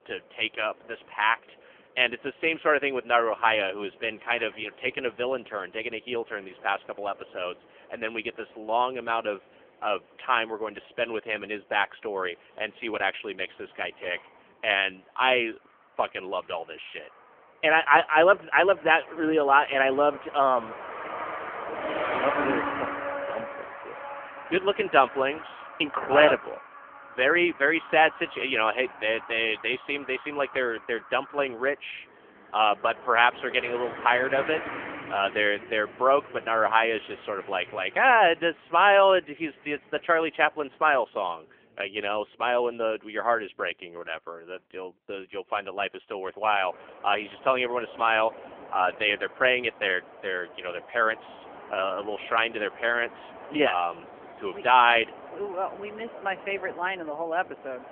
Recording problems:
phone-call audio; poor line; nothing above 3 kHz
traffic noise; noticeable; throughout; 15 dB below the speech

